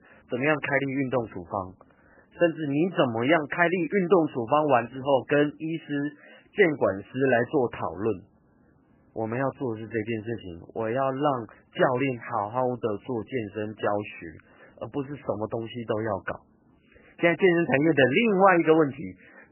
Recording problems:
garbled, watery; badly; nothing above 3 kHz

